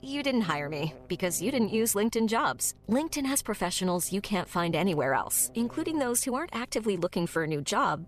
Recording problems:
electrical hum; faint; throughout; 50 Hz, 25 dB below the speech

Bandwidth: 14.5 kHz